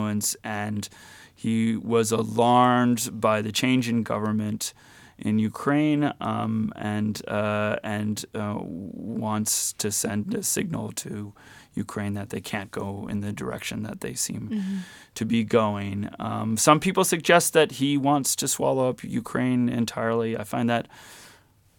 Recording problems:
abrupt cut into speech; at the start

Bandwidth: 17 kHz